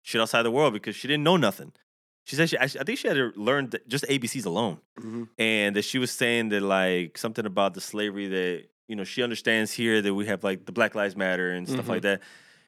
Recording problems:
none

